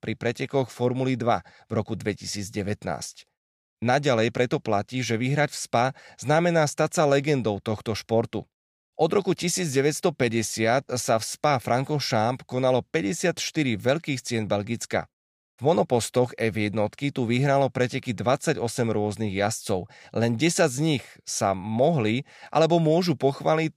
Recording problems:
none

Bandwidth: 15 kHz